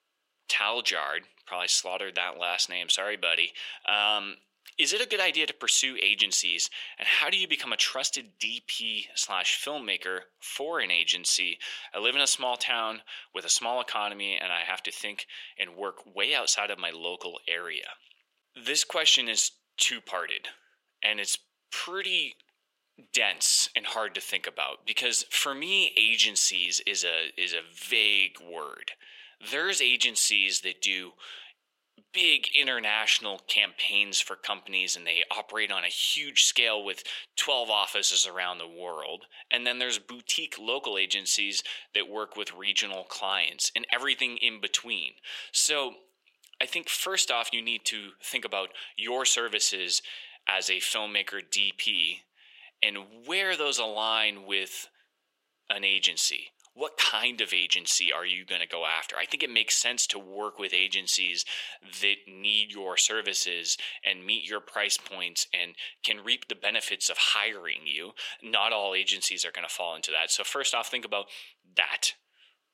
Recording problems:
thin; very; fading below 500 Hz

